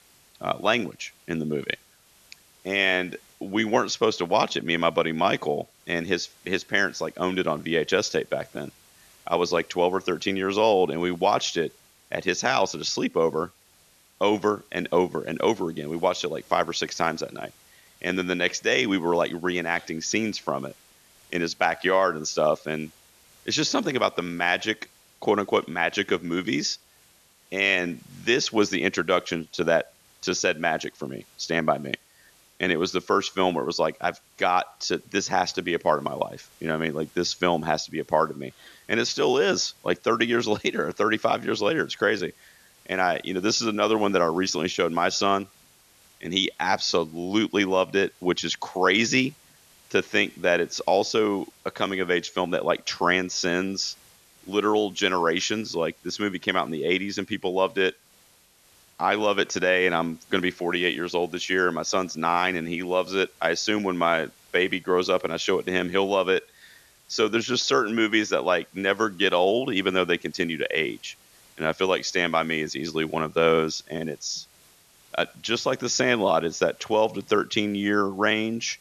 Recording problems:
high frequencies cut off; noticeable; nothing above 7 kHz
hiss; faint; throughout; 30 dB below the speech

